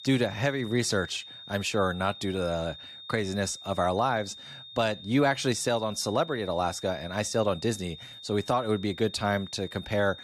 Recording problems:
high-pitched whine; noticeable; throughout; 3.5 kHz, 15 dB below the speech

